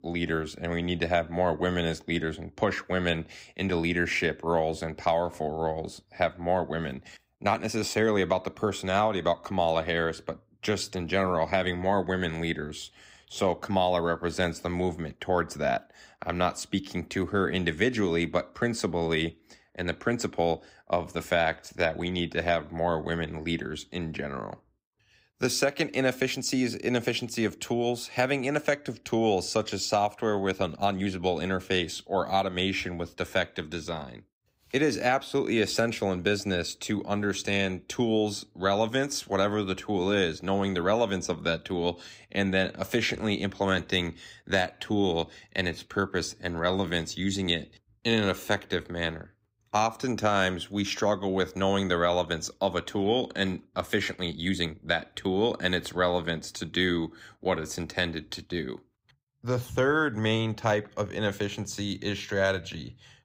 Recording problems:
uneven, jittery; strongly; from 7 to 55 s

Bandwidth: 15.5 kHz